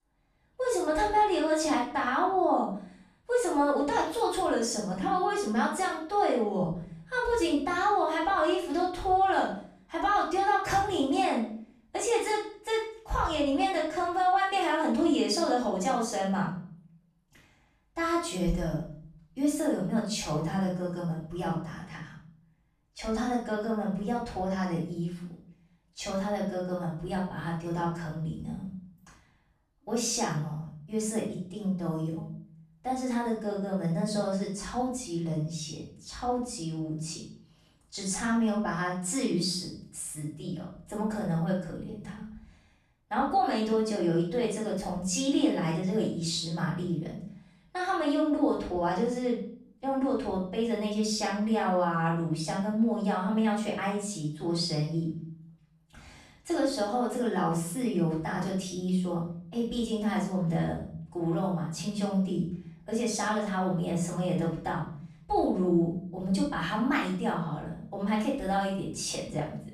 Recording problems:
off-mic speech; far
room echo; noticeable; dies away in 0.6 s

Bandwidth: 14.5 kHz